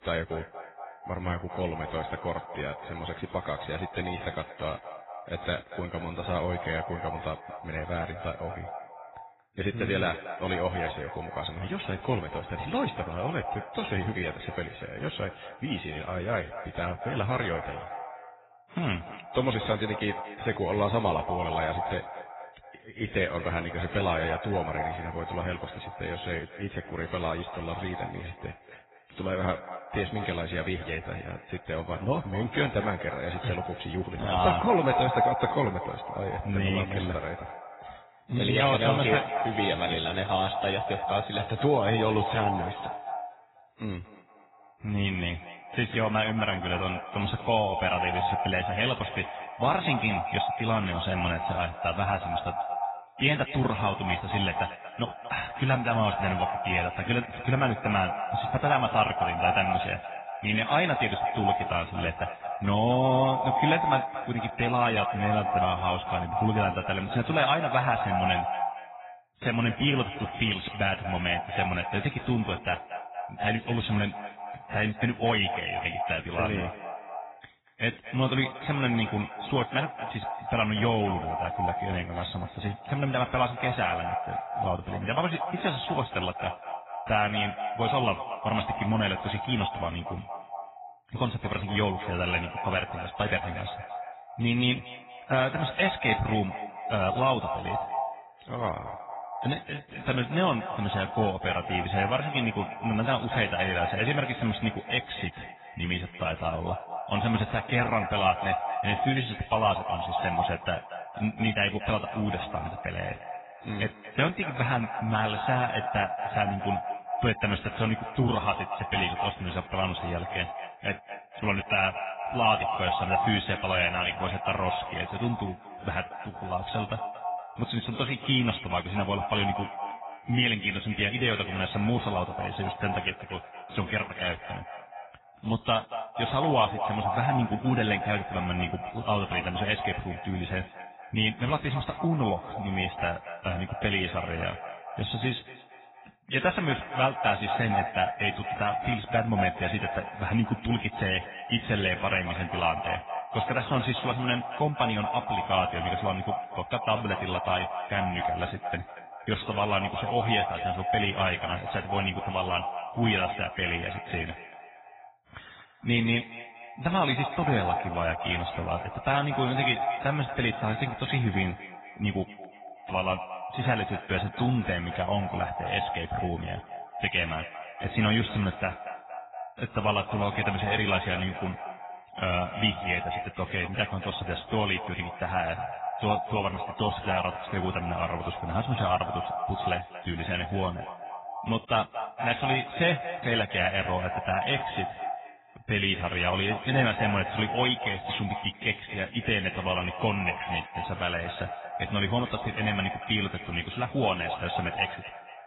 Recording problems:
echo of what is said; strong; throughout; 230 ms later, 6 dB below the speech
garbled, watery; badly; nothing above 4 kHz

